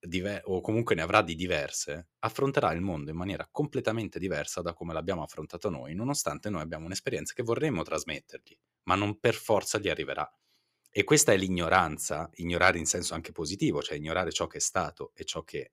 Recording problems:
none

